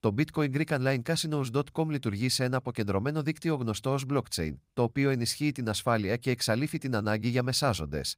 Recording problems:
none

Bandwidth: 15.5 kHz